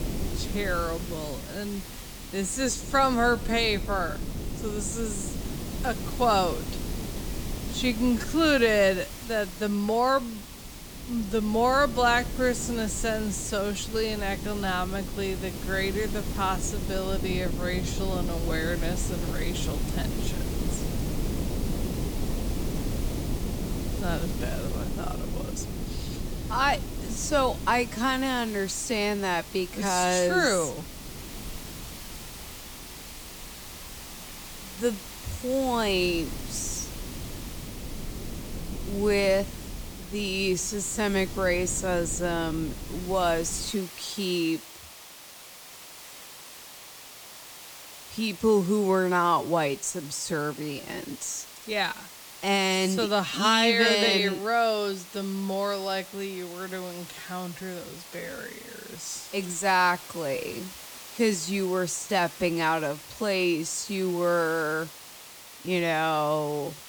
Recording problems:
wrong speed, natural pitch; too slow; 0.6 times normal speed
wind noise on the microphone; occasional gusts; until 44 s; 15 dB below the speech
hiss; noticeable; throughout; 15 dB below the speech

